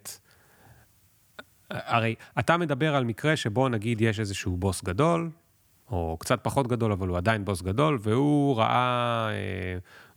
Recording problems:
none

